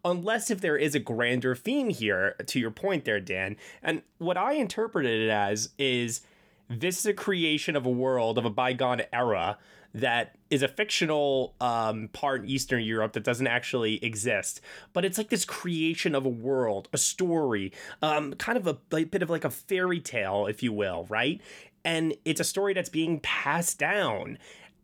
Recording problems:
none

